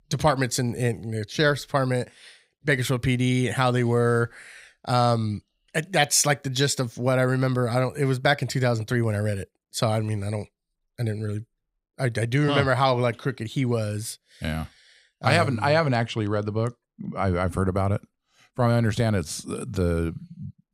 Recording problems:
none

